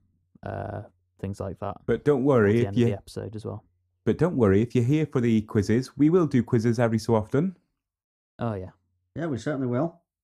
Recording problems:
muffled; slightly; fading above 1 kHz

